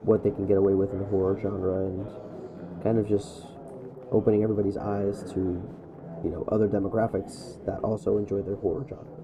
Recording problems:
muffled; very; fading above 1 kHz
chatter from many people; noticeable; throughout; 15 dB below the speech

